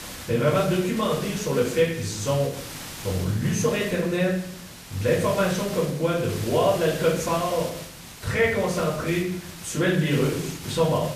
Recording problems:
off-mic speech; far
room echo; noticeable; dies away in 0.7 s
hiss; noticeable; throughout; 15 dB below the speech

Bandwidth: 14.5 kHz